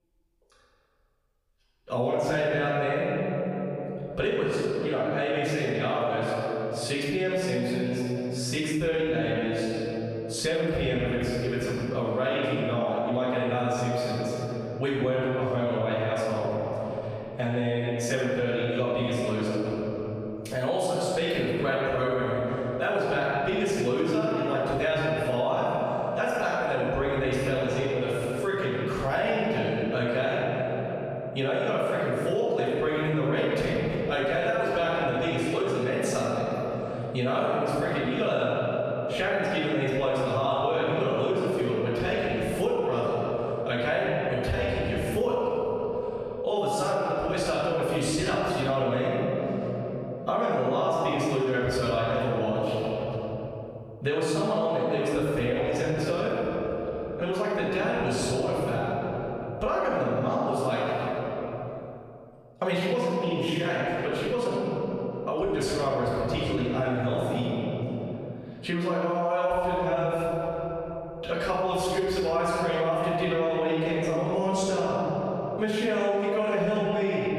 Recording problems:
room echo; strong; dies away in 1.9 s
off-mic speech; far
squashed, flat; somewhat

